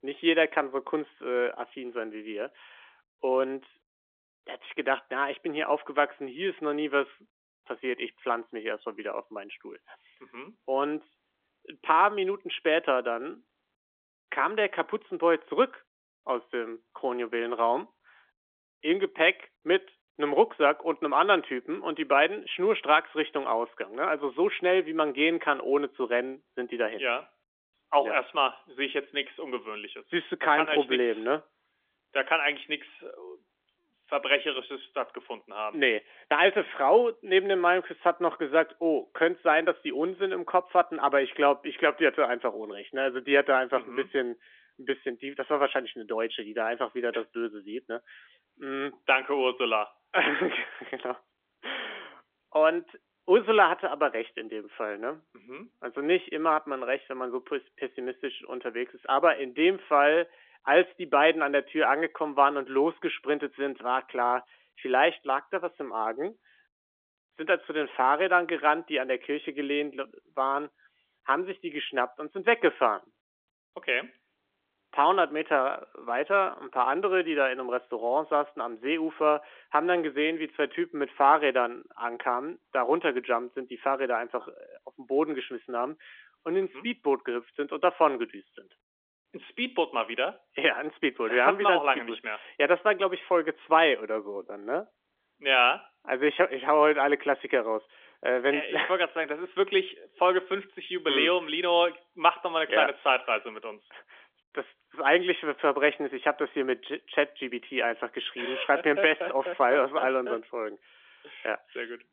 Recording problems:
phone-call audio; nothing above 3.5 kHz

